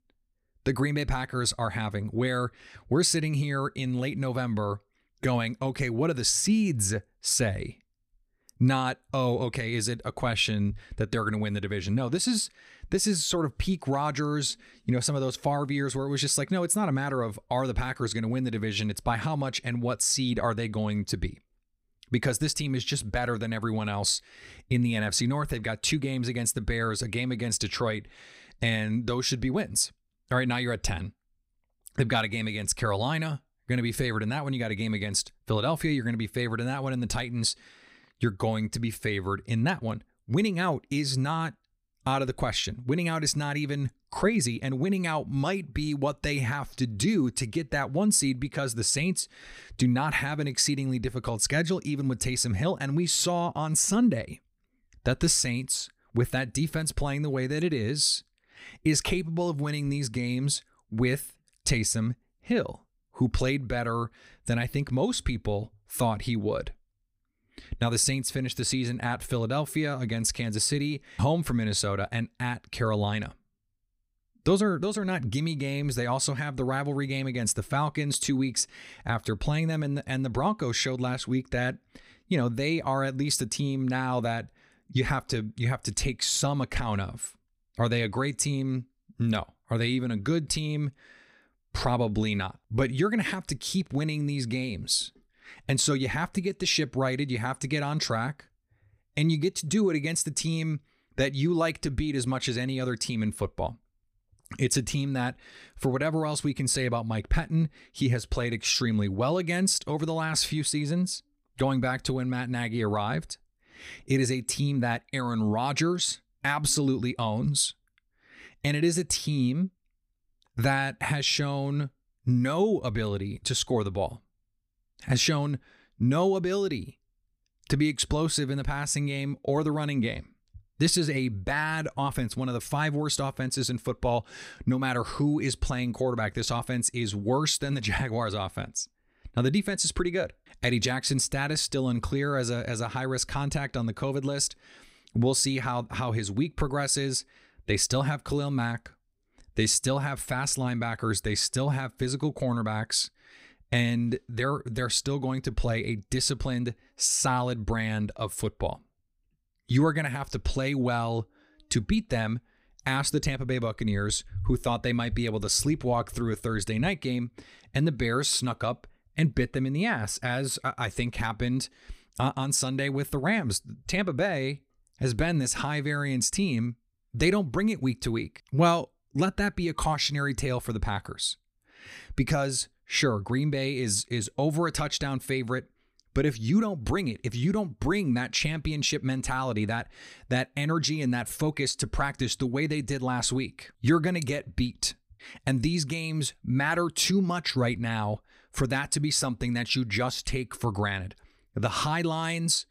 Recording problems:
none

